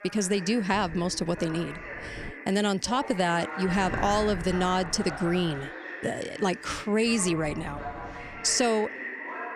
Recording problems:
voice in the background; noticeable; throughout; 10 dB below the speech
wind noise on the microphone; occasional gusts; from 0.5 to 2.5 s, from 3.5 to 5.5 s and from 7 to 8.5 s; 20 dB below the speech

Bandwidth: 15 kHz